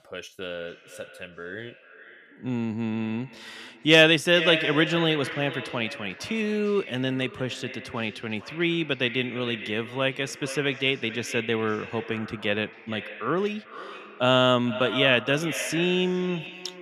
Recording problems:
echo of what is said; strong; throughout; 450 ms later, 10 dB below the speech

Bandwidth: 14.5 kHz